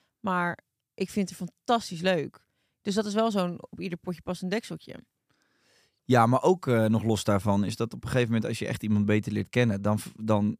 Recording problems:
none

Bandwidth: 15 kHz